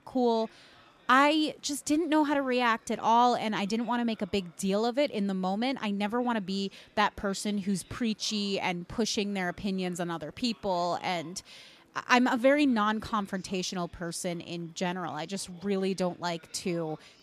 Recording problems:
murmuring crowd; faint; throughout; 30 dB below the speech

